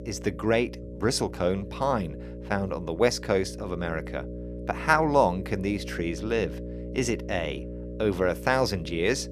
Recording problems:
electrical hum; noticeable; throughout; 60 Hz, 15 dB below the speech

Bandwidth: 14.5 kHz